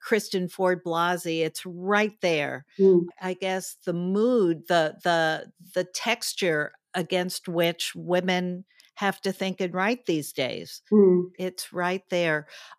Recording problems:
none

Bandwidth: 14.5 kHz